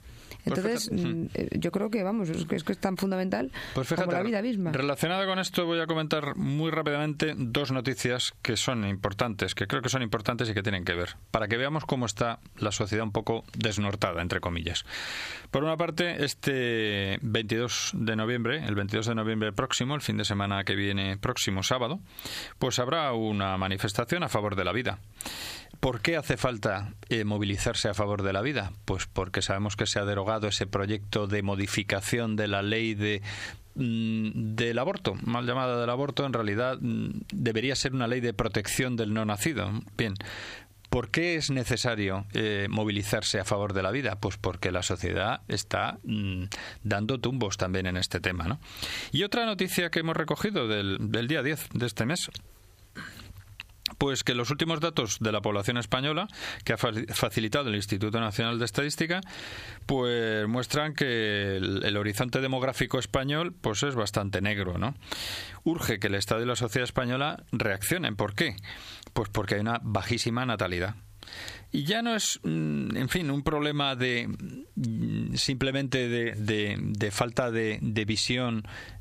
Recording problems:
squashed, flat; heavily

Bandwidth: 15 kHz